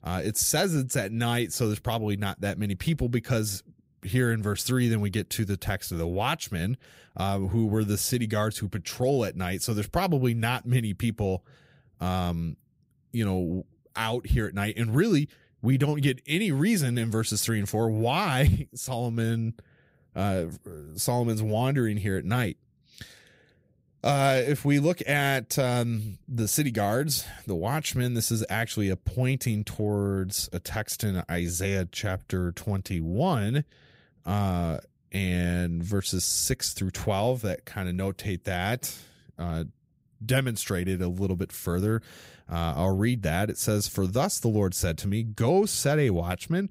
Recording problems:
none

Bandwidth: 15.5 kHz